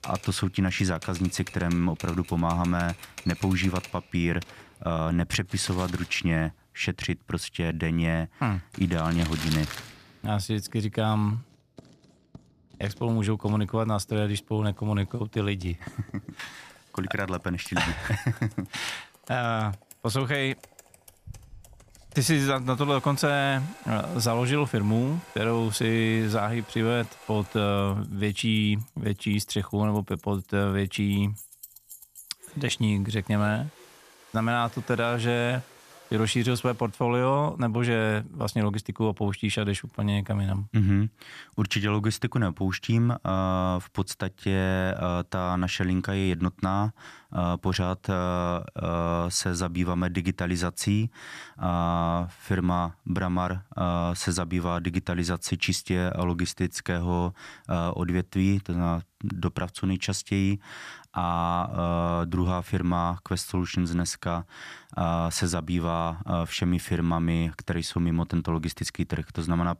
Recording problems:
household noises; noticeable; until 37 s; 20 dB below the speech

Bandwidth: 14.5 kHz